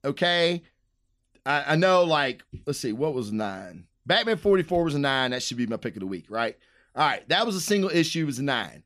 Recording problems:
none

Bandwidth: 14.5 kHz